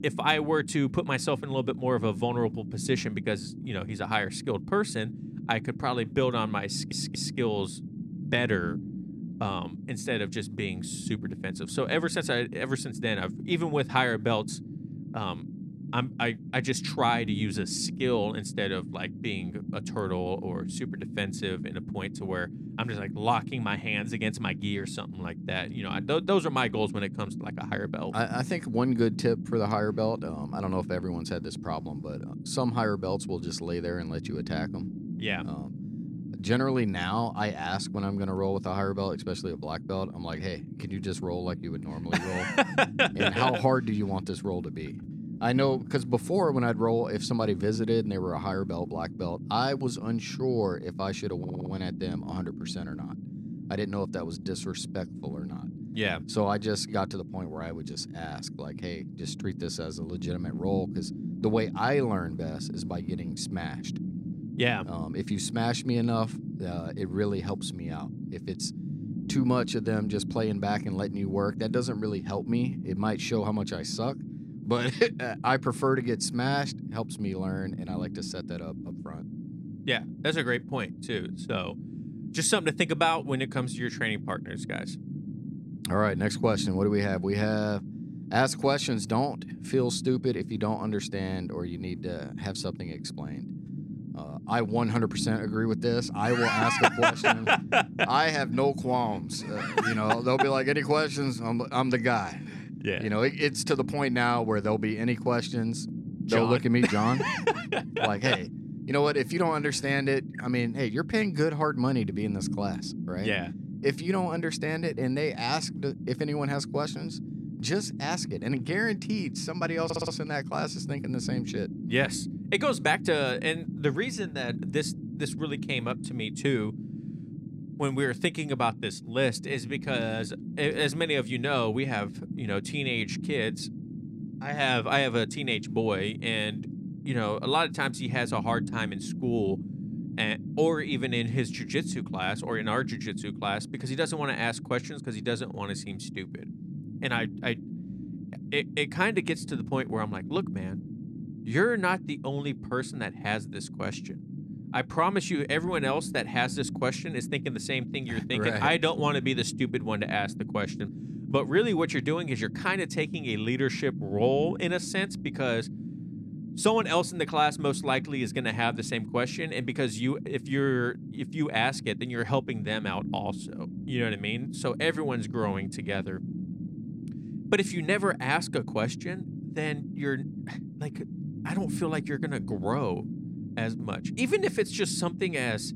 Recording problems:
low rumble; noticeable; throughout; 15 dB below the speech
audio stuttering; at 6.5 s, at 51 s and at 2:00

